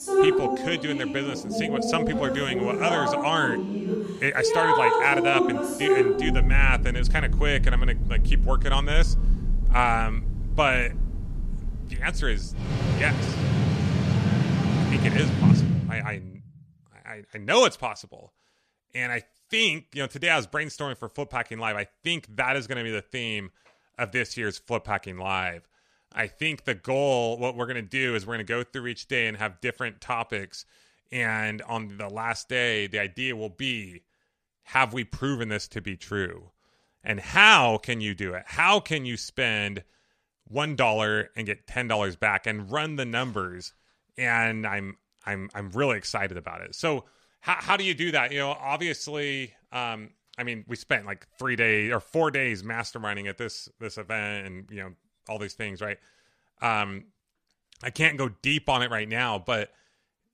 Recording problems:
rain or running water; very loud; until 16 s; 1 dB above the speech

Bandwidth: 14 kHz